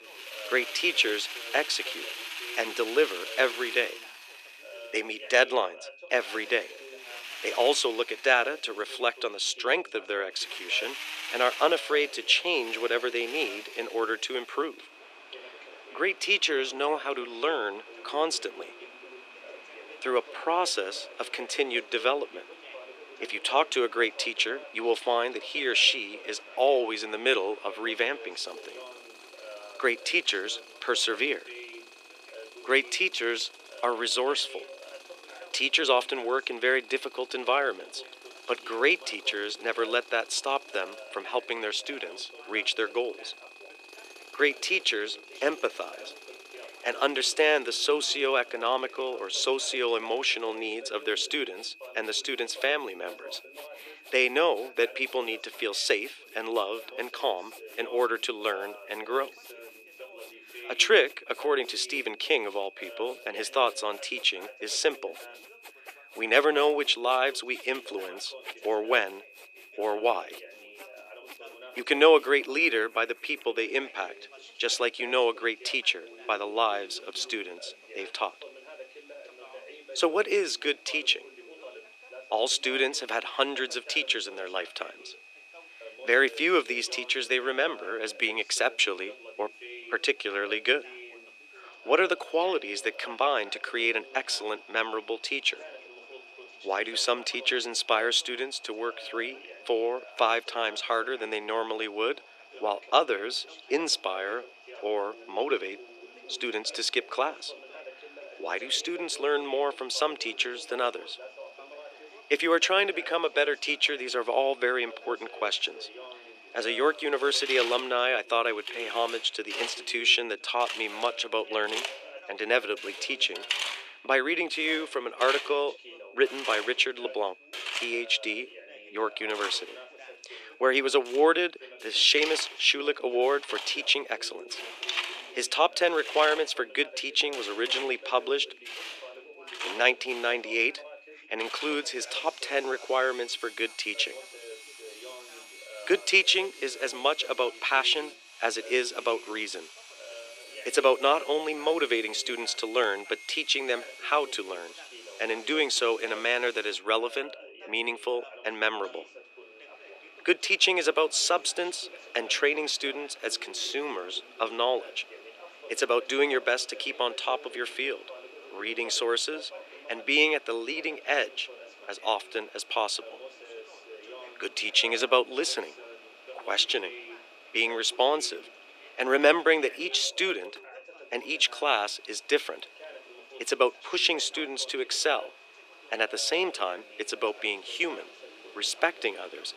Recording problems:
thin; very; fading below 350 Hz
machinery noise; noticeable; throughout; 15 dB below the speech
high-pitched whine; faint; throughout; 2.5 kHz, 25 dB below the speech
background chatter; faint; throughout; 2 voices, 20 dB below the speech

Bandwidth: 14.5 kHz